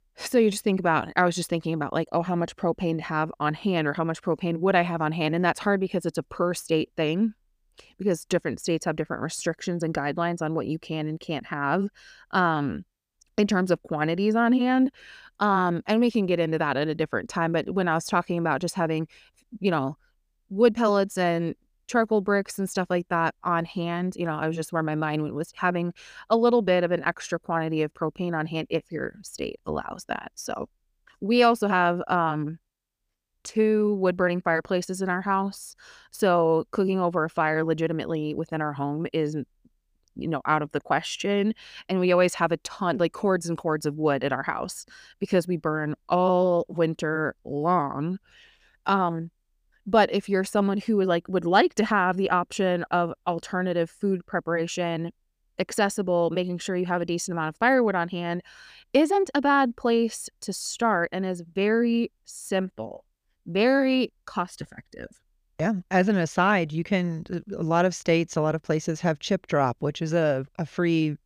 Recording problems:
none

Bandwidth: 15 kHz